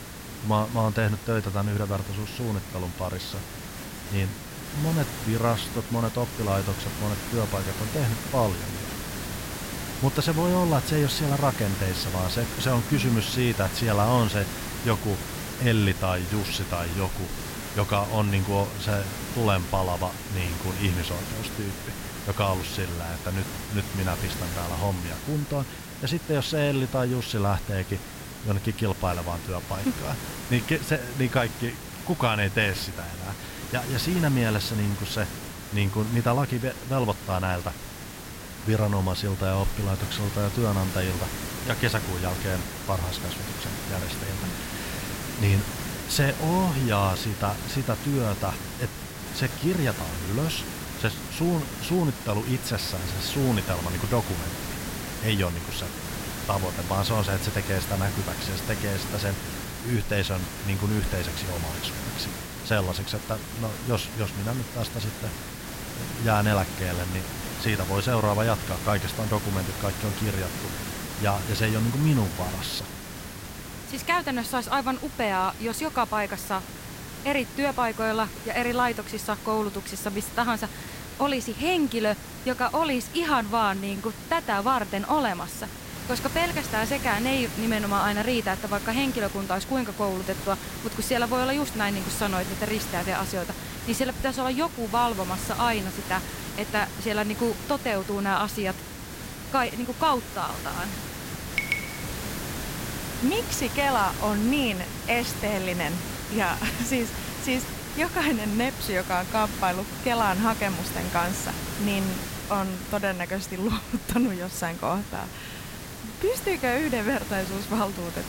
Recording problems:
hiss; loud; throughout; 7 dB below the speech

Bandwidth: 16 kHz